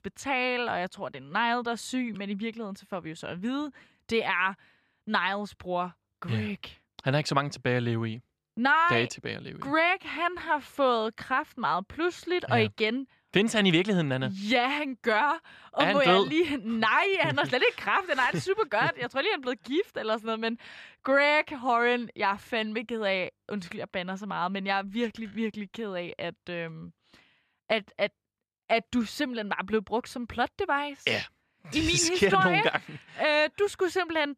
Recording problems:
none

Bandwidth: 14.5 kHz